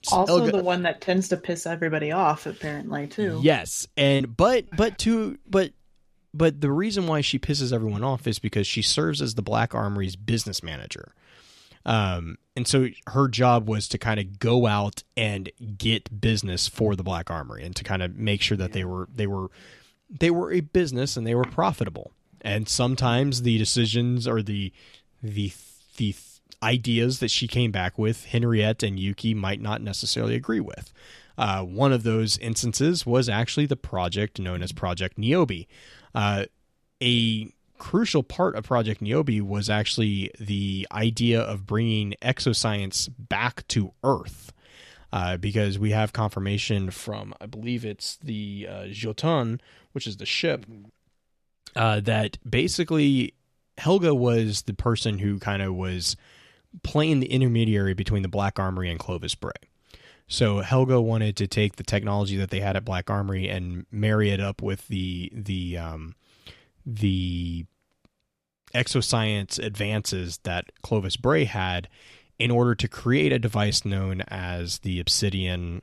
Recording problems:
choppy; very; at 4 s; 6% of the speech affected

